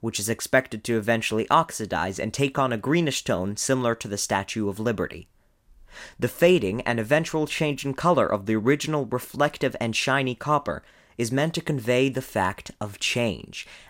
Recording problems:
none

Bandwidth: 16 kHz